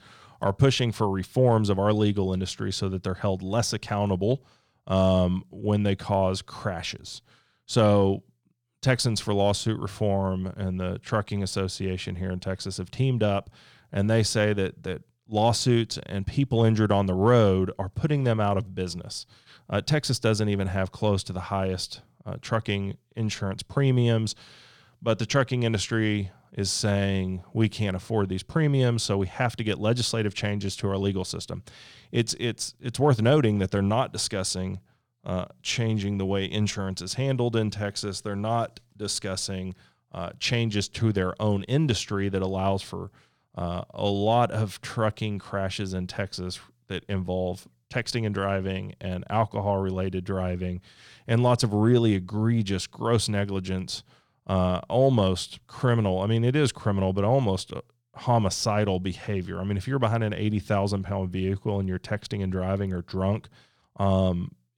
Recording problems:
none

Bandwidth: 18.5 kHz